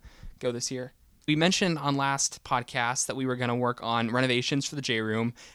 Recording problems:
none

